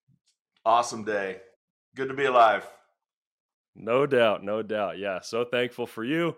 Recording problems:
none

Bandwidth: 16 kHz